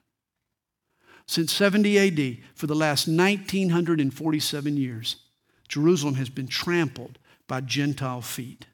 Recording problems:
none

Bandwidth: 18 kHz